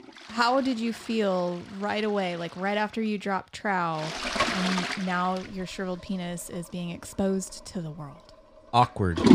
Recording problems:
household noises; loud; throughout; 4 dB below the speech

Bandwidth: 15 kHz